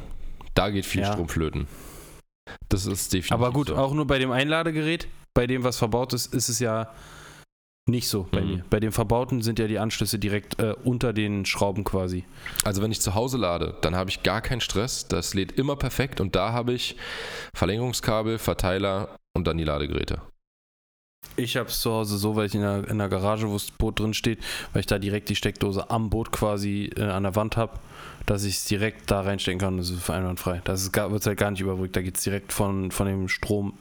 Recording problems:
squashed, flat; heavily

